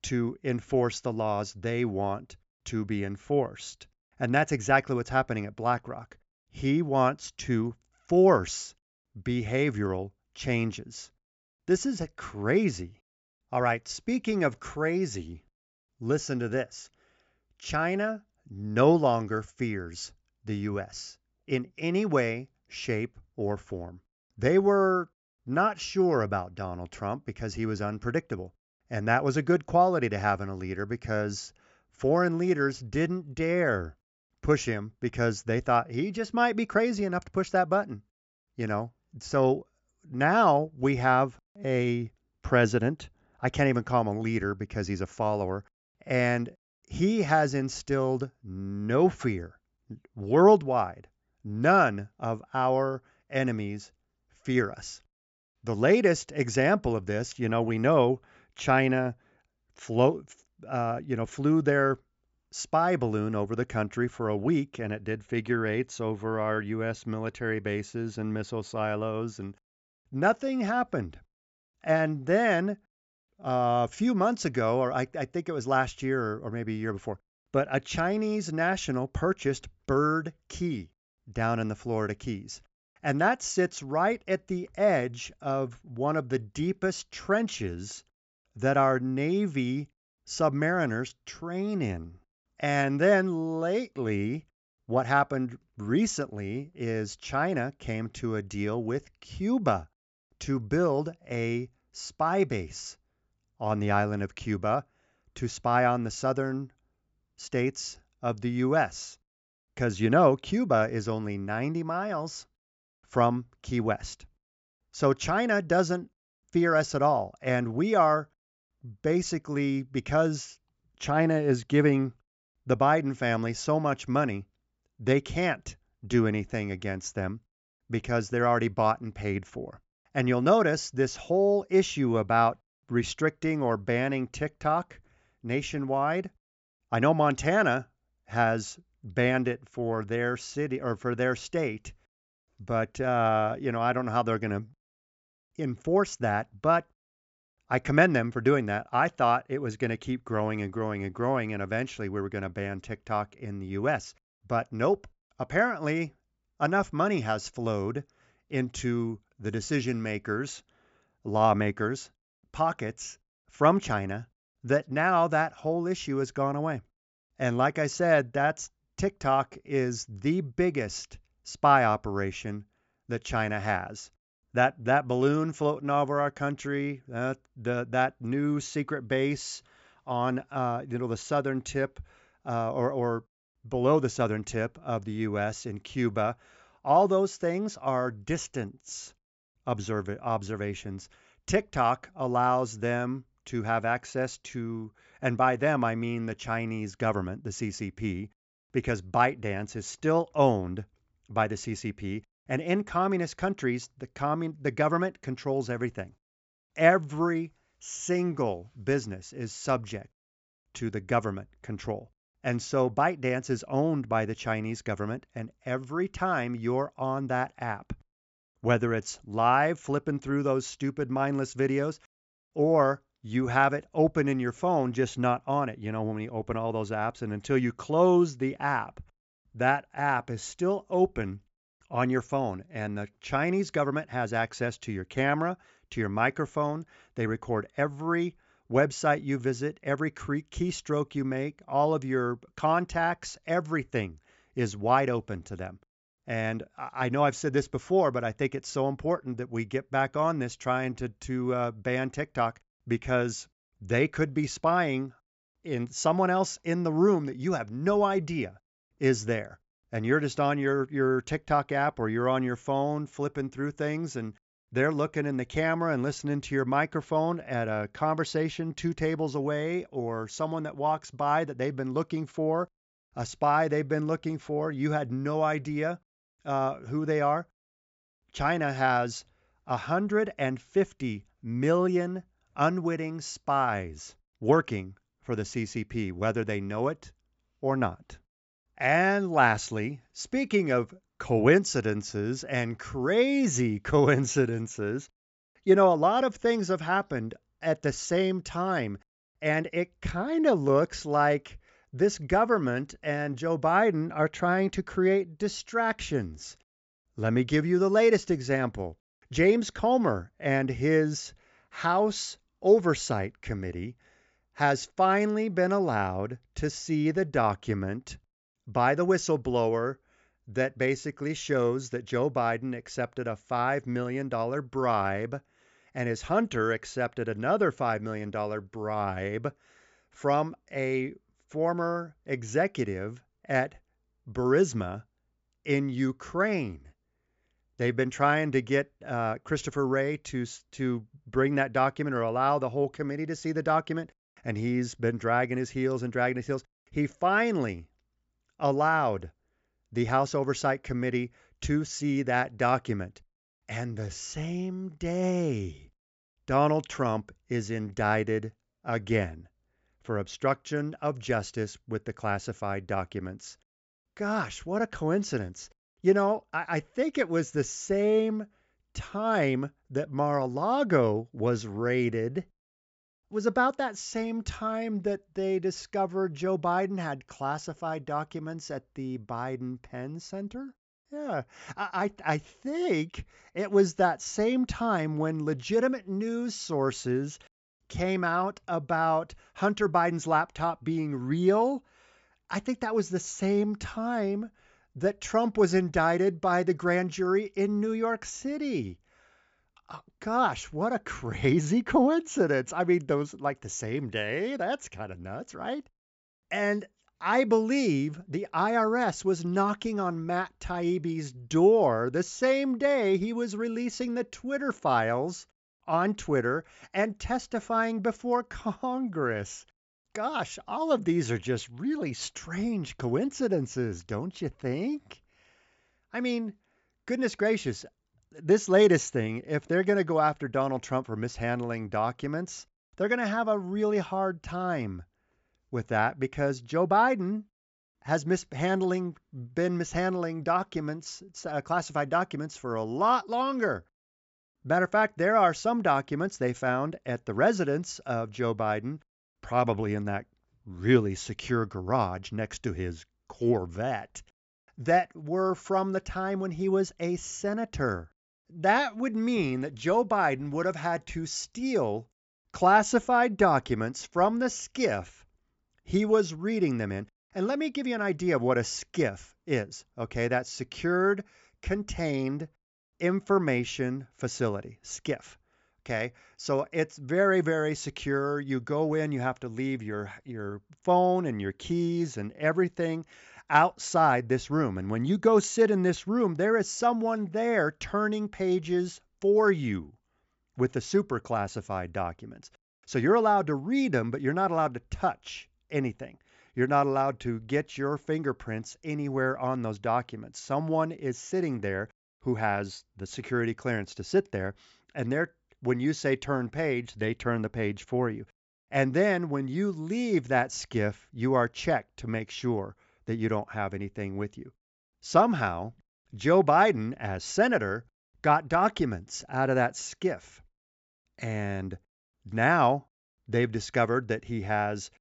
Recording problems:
high frequencies cut off; noticeable; nothing above 8 kHz

